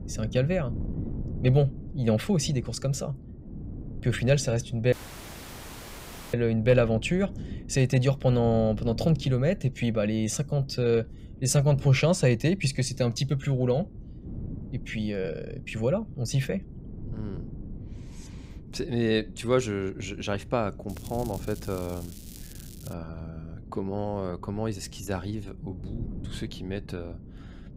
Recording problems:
wind noise on the microphone; occasional gusts; 20 dB below the speech
crackling; faint; from 21 to 23 s; 20 dB below the speech
audio cutting out; at 5 s for 1.5 s

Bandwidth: 15.5 kHz